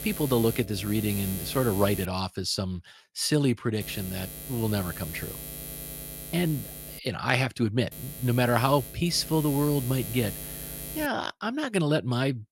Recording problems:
electrical hum; noticeable; until 2 s, from 4 to 7 s and from 8 to 11 s; 60 Hz, 10 dB below the speech

